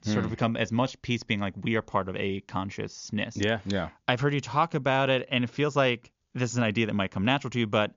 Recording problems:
high frequencies cut off; noticeable; nothing above 7 kHz

